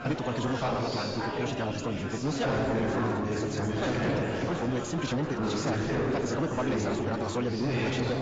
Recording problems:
garbled, watery; badly; nothing above 7.5 kHz
wrong speed, natural pitch; too fast; 1.7 times normal speed
distortion; slight; 10 dB below the speech
chatter from many people; very loud; throughout; 1 dB above the speech

